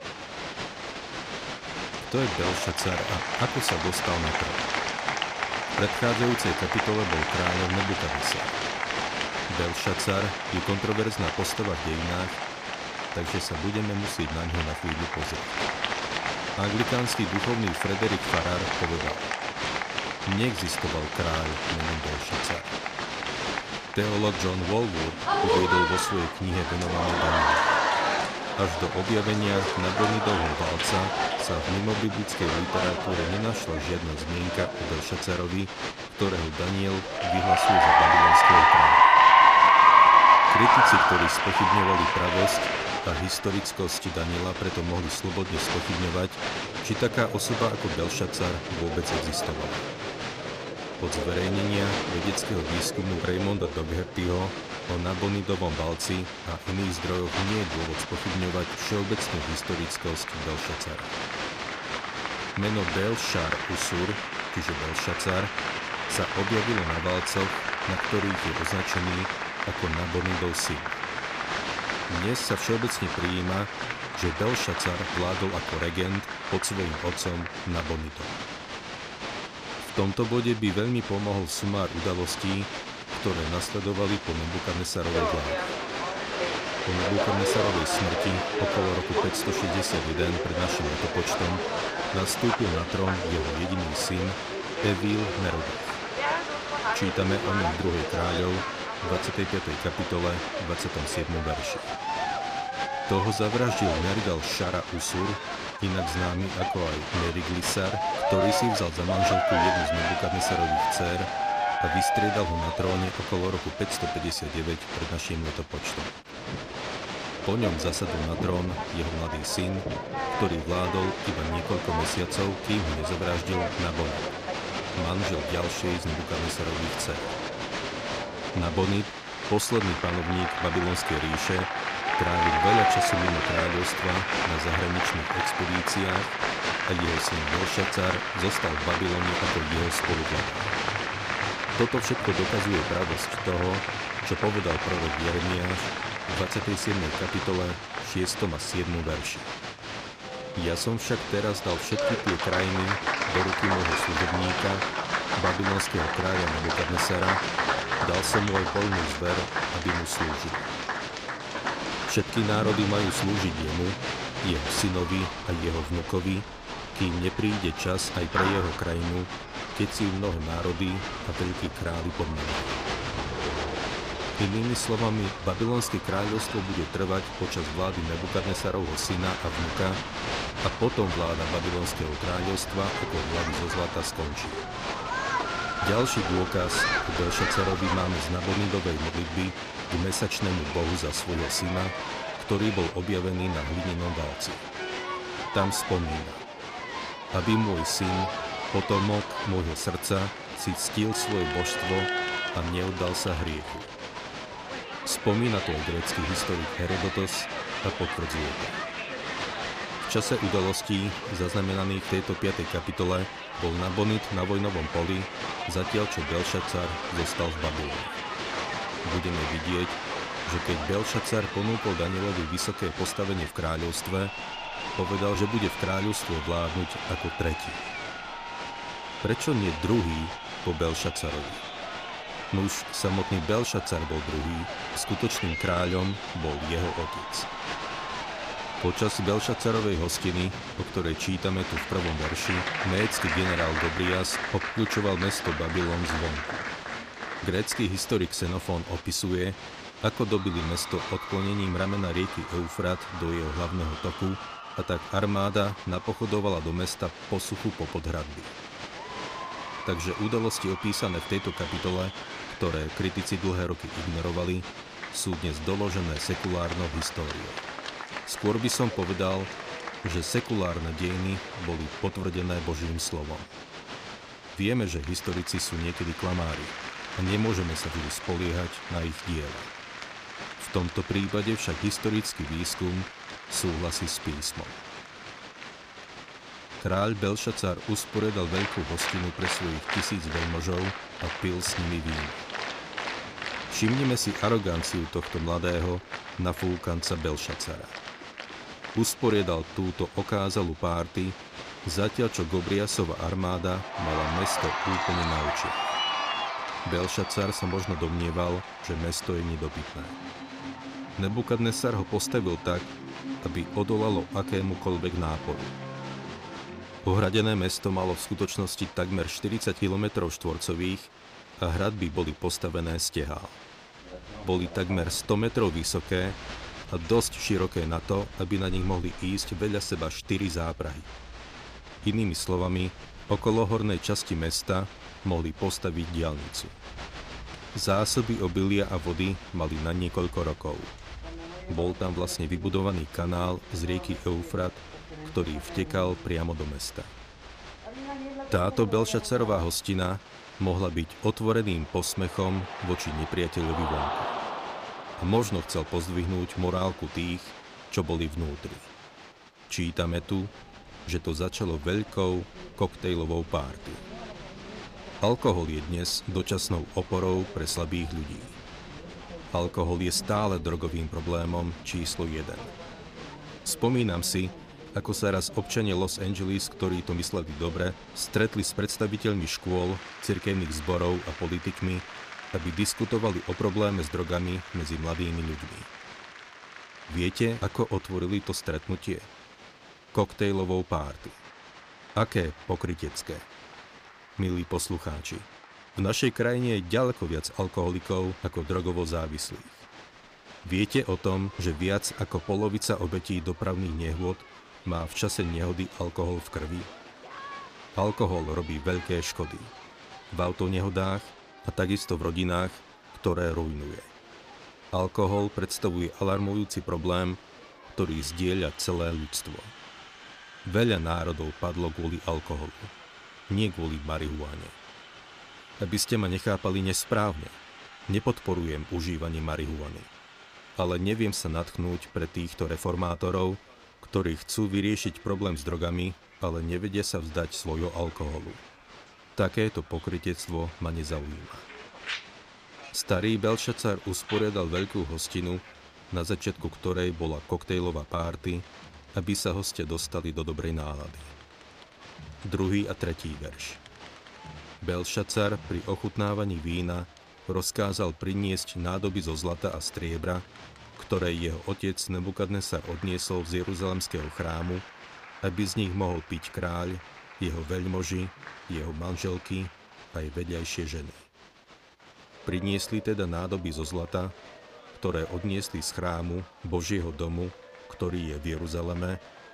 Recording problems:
crowd noise; very loud; throughout; as loud as the speech

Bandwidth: 15 kHz